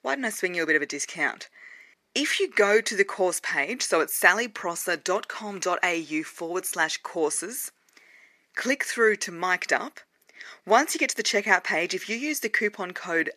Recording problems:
thin; somewhat; fading below 450 Hz

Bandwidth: 14.5 kHz